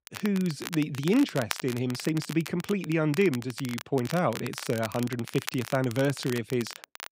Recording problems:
crackle, like an old record; noticeable; 10 dB below the speech

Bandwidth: 15.5 kHz